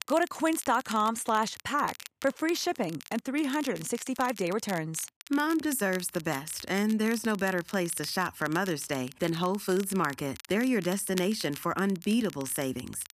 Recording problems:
crackle, like an old record; noticeable; 15 dB below the speech

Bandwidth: 14.5 kHz